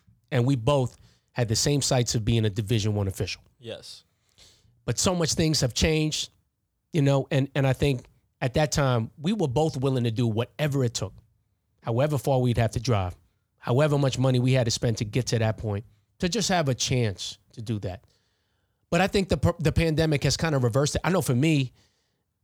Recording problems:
none

